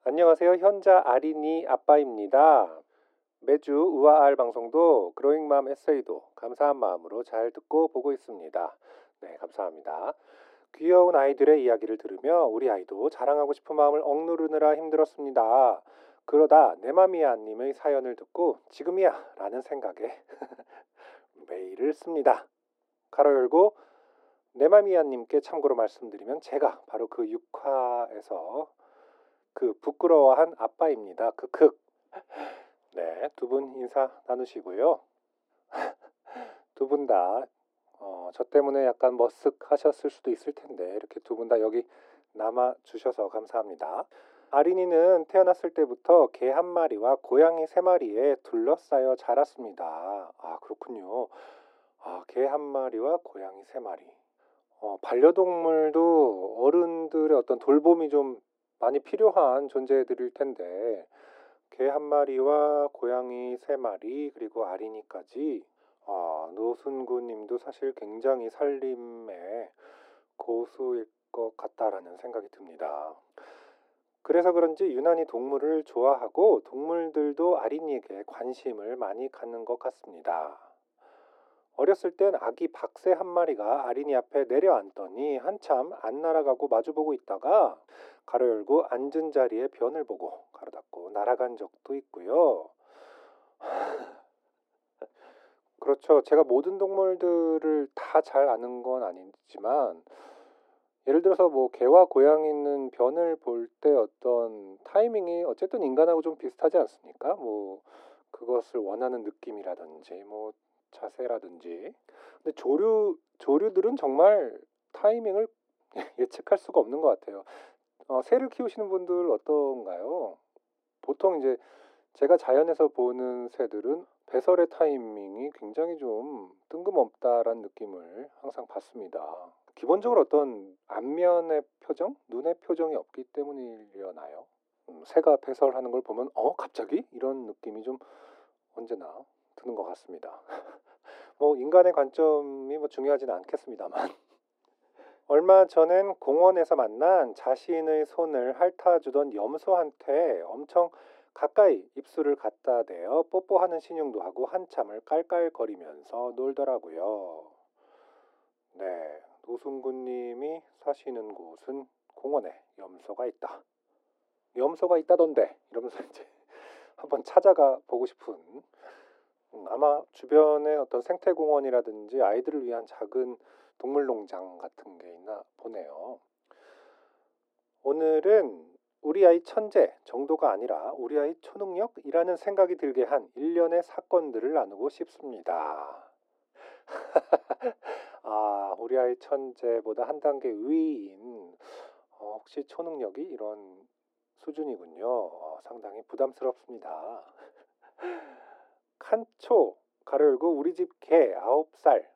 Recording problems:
muffled; very; fading above 1.5 kHz
thin; somewhat; fading below 300 Hz

